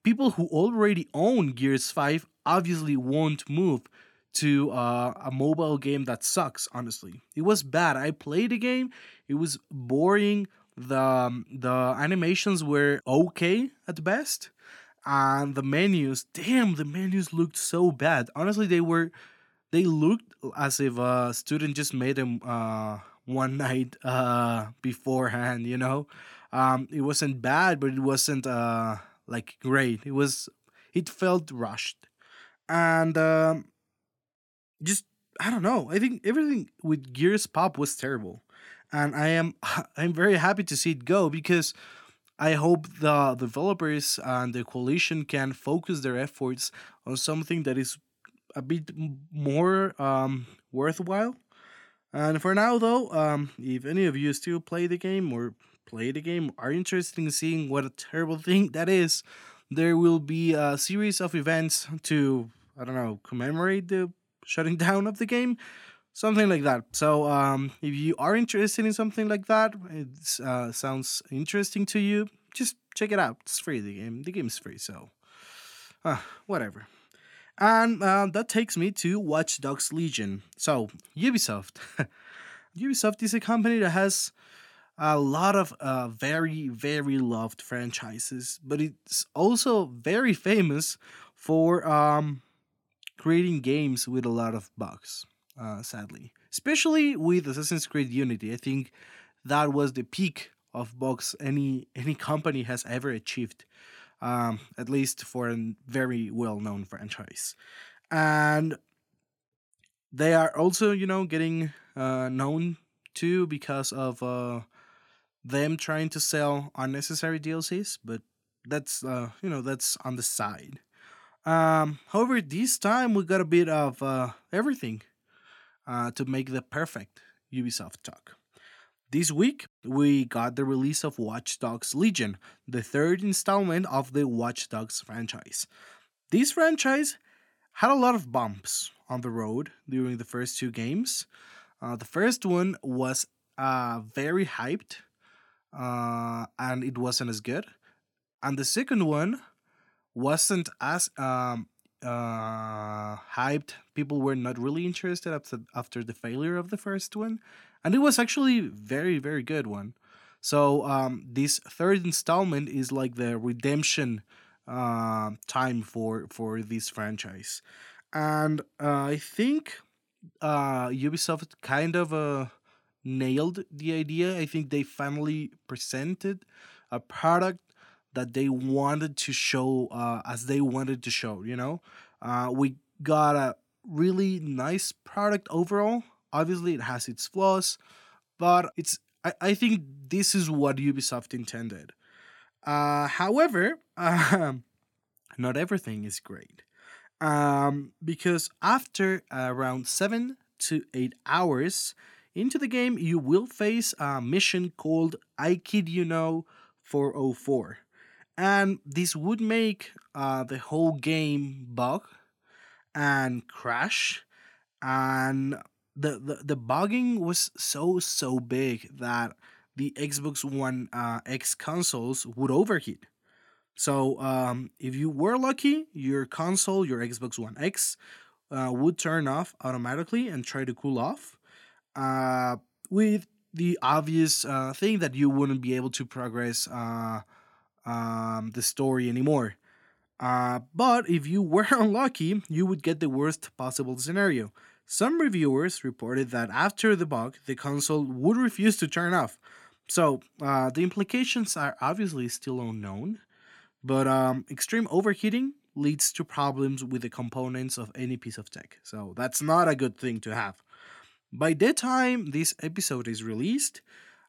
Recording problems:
none

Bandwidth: 18 kHz